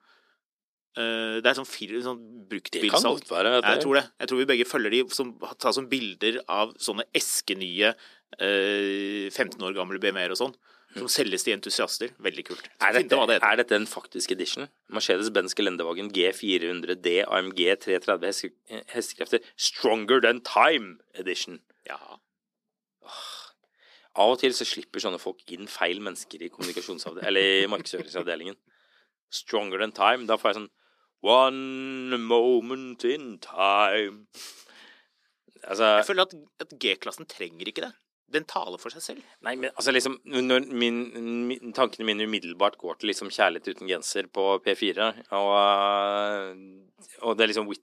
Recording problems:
thin; somewhat; fading below 300 Hz

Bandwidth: 14 kHz